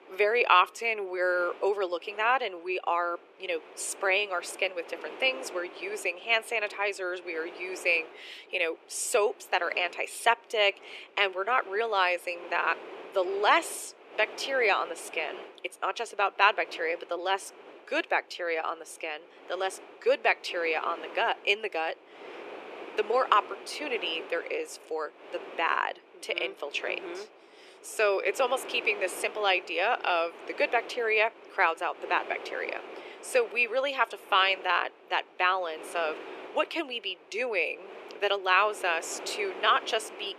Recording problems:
thin; very; fading below 400 Hz
wind noise on the microphone; occasional gusts; 20 dB below the speech

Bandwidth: 13.5 kHz